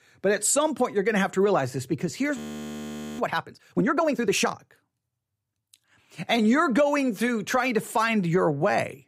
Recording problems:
audio freezing; at 2.5 s for 1 s

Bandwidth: 15.5 kHz